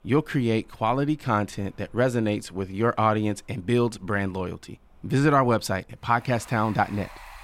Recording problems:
rain or running water; faint; throughout; 25 dB below the speech

